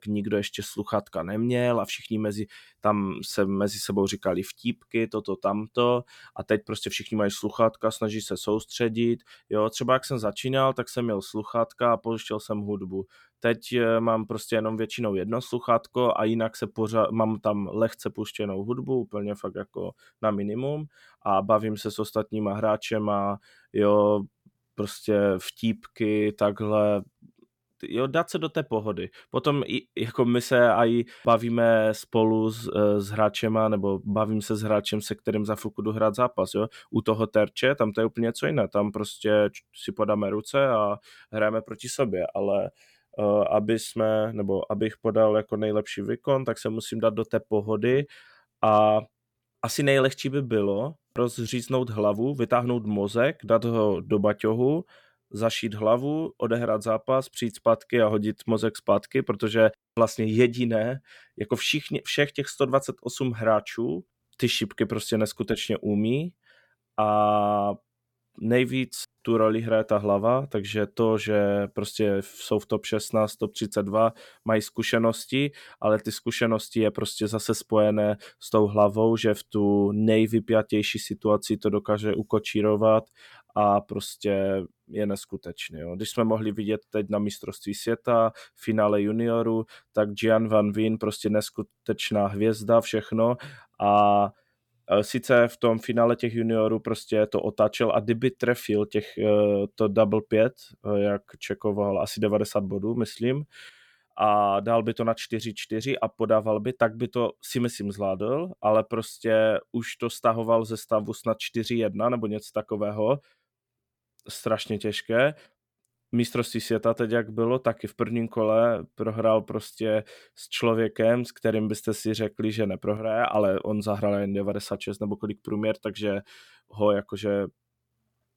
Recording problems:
none

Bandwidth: 18.5 kHz